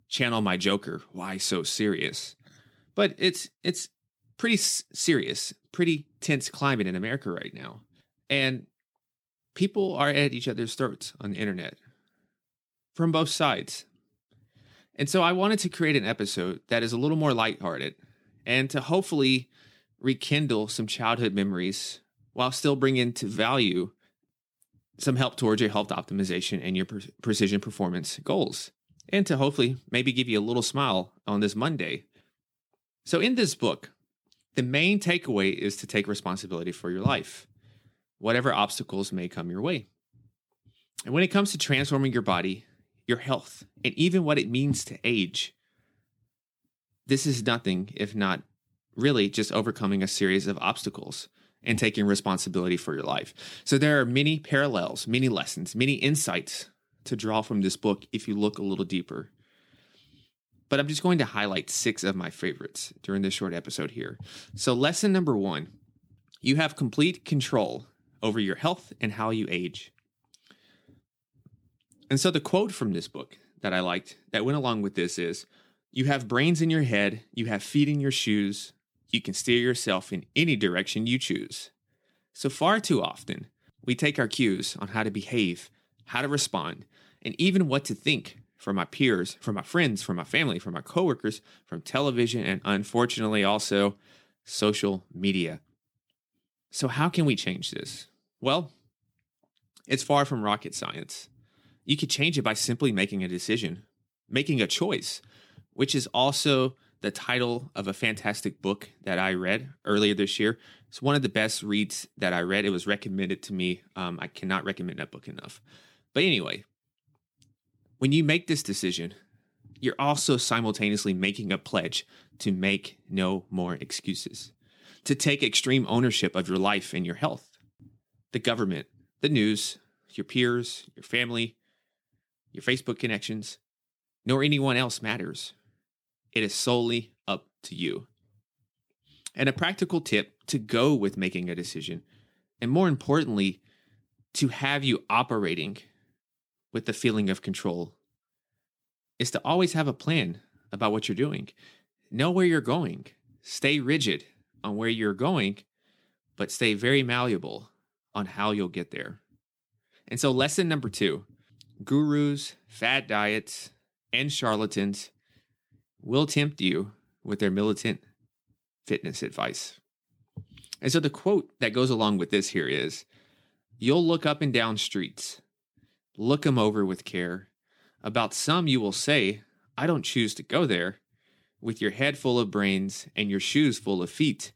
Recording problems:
none

